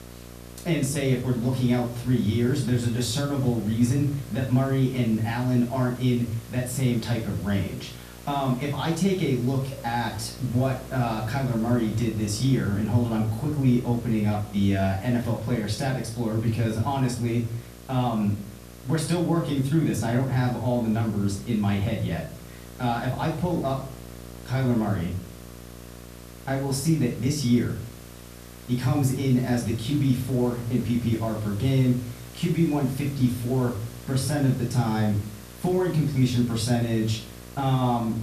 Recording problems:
off-mic speech; far
room echo; slight; dies away in 0.4 s
electrical hum; noticeable; throughout; 60 Hz, 20 dB below the speech
hiss; faint; throughout; 20 dB below the speech

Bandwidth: 14.5 kHz